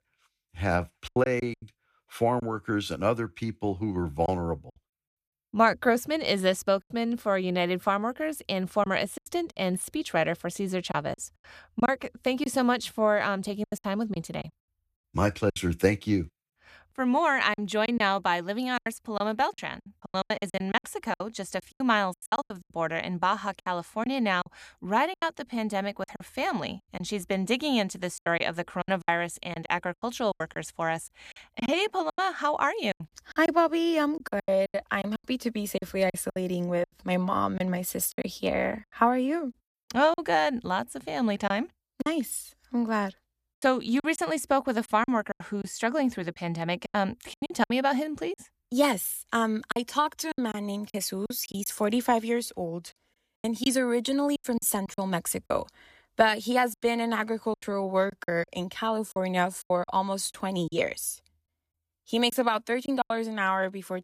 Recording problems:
choppy; very; 10% of the speech affected

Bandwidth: 14.5 kHz